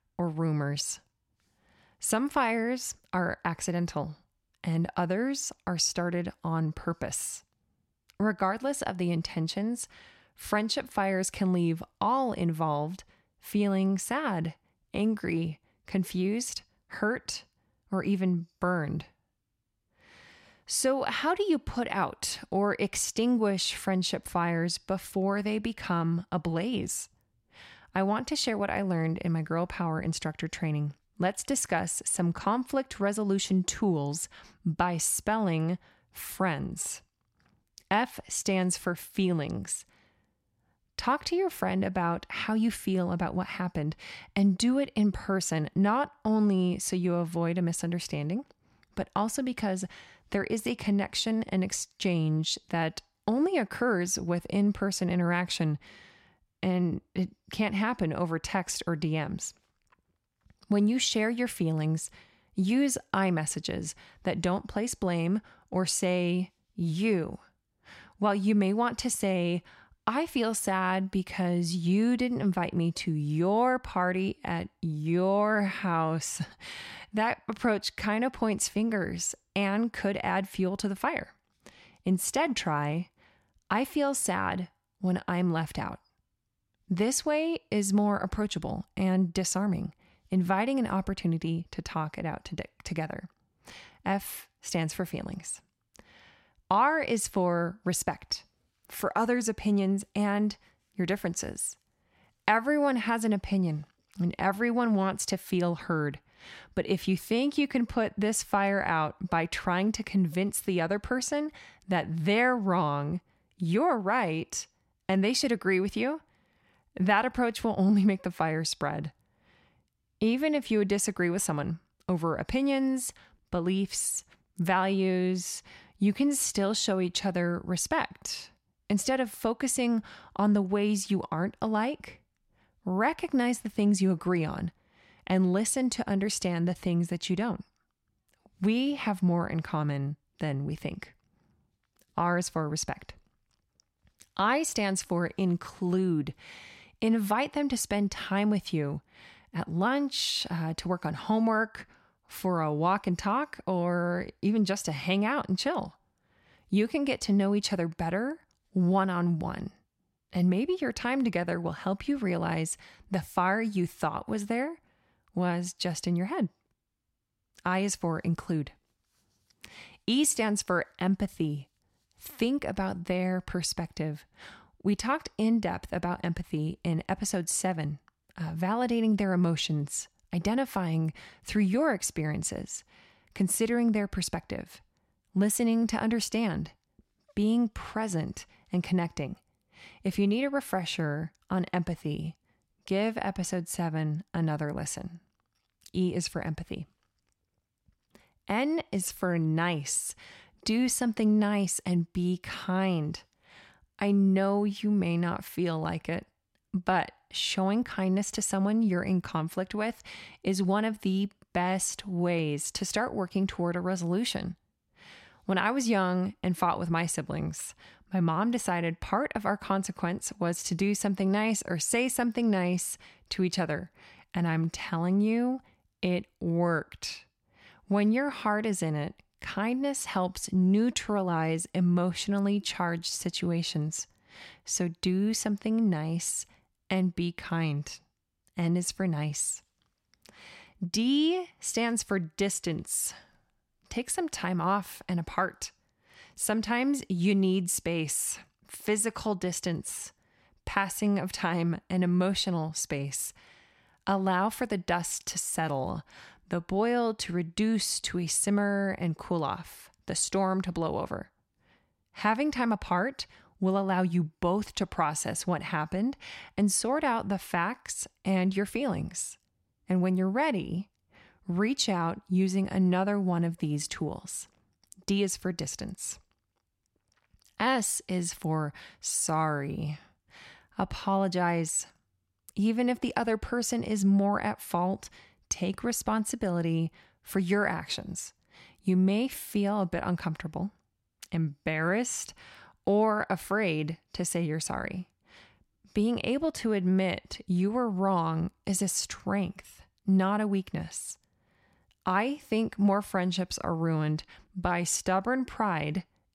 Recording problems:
none

